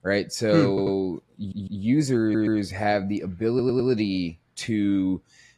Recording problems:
garbled, watery; slightly
audio stuttering; 4 times, first at 0.5 s

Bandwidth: 14 kHz